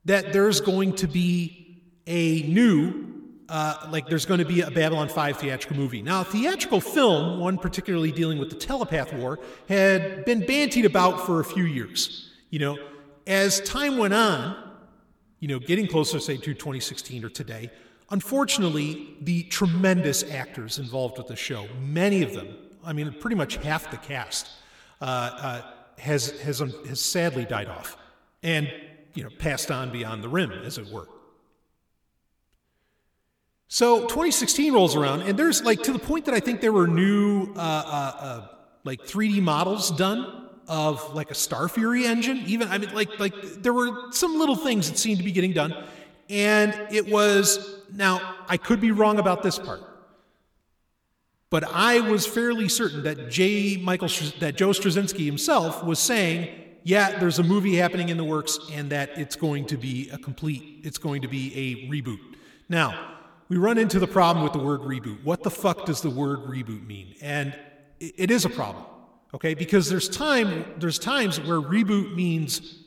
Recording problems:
echo of what is said; noticeable; throughout; 120 ms later, 15 dB below the speech

